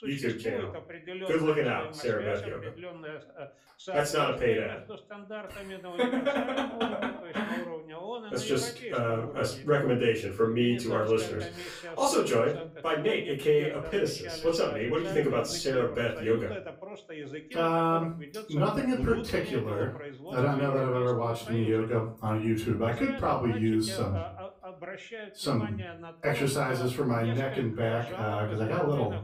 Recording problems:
off-mic speech; far
room echo; slight; dies away in 0.3 s
voice in the background; noticeable; throughout; 10 dB below the speech

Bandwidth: 15.5 kHz